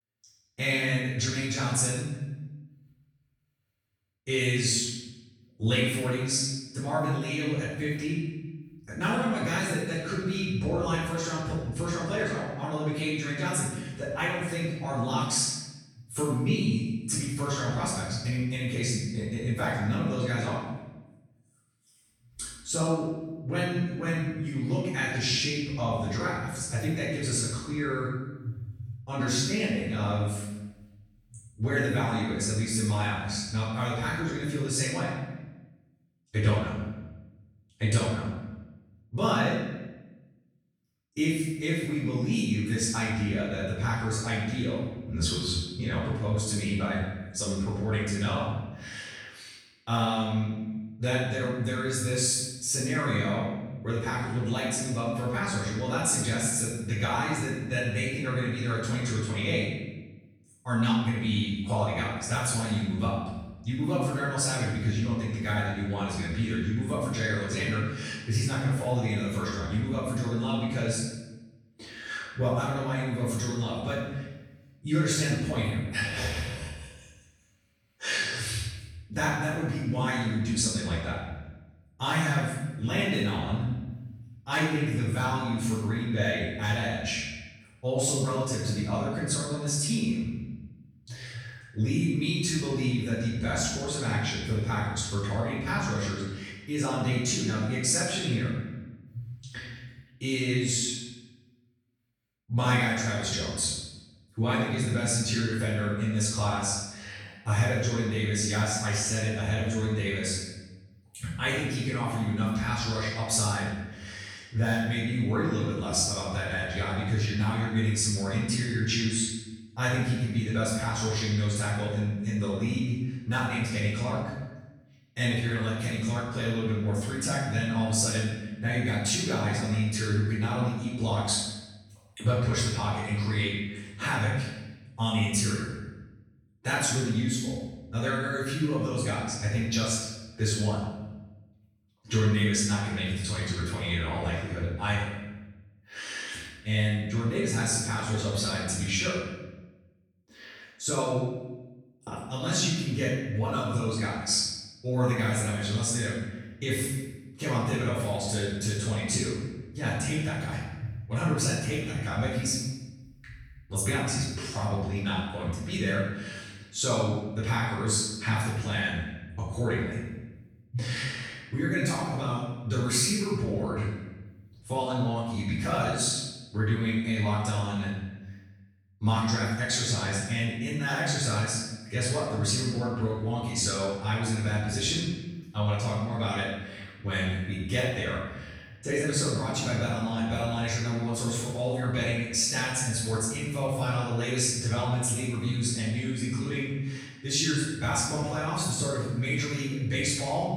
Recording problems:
room echo; strong; dies away in 1.1 s
off-mic speech; far

